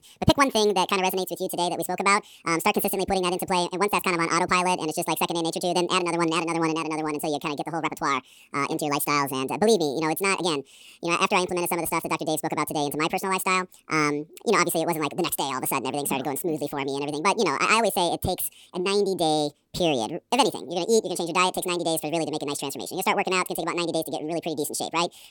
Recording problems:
wrong speed and pitch; too fast and too high; 1.7 times normal speed

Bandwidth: 18.5 kHz